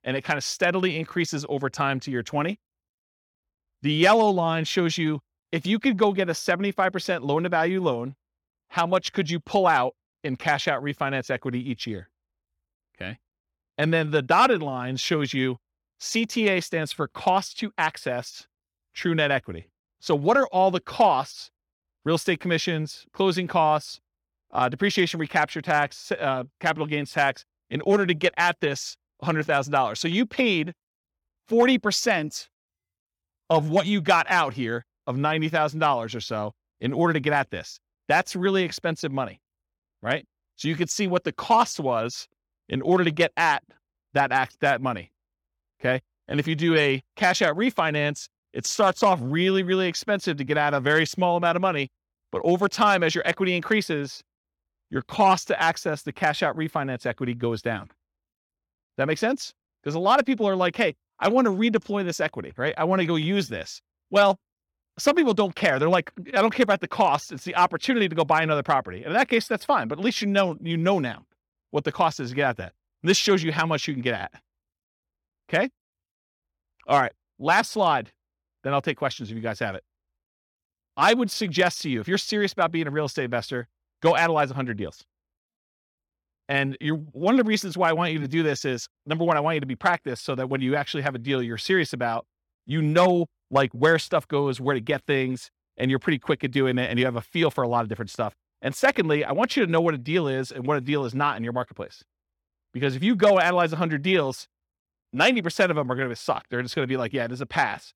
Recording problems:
none

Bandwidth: 17 kHz